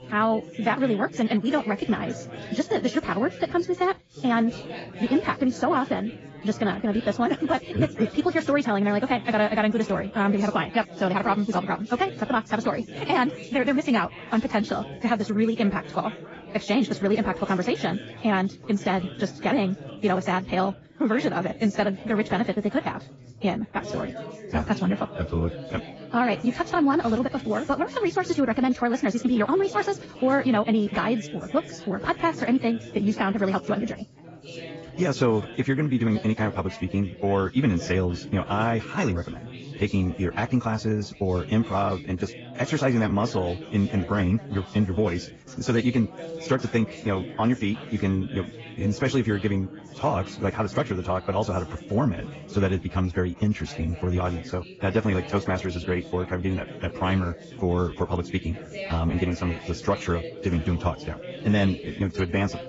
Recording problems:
garbled, watery; badly; nothing above 7.5 kHz
wrong speed, natural pitch; too fast; 1.6 times normal speed
background chatter; noticeable; throughout; 4 voices, 15 dB below the speech

